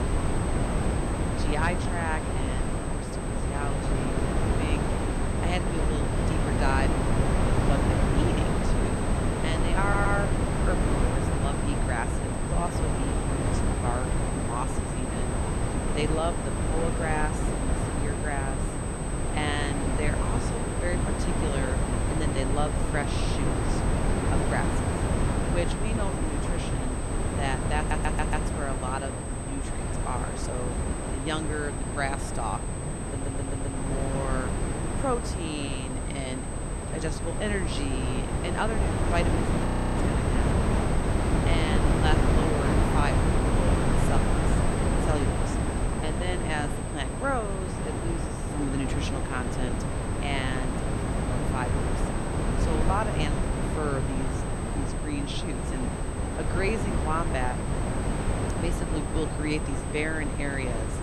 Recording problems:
wind noise on the microphone; heavy; 1 dB above the speech
high-pitched whine; loud; throughout; 8 kHz, 8 dB below the speech
low rumble; faint; throughout; 25 dB below the speech
audio stuttering; at 10 s, at 28 s and at 33 s
audio freezing; at 40 s

